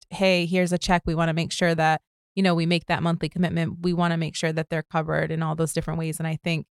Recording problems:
none

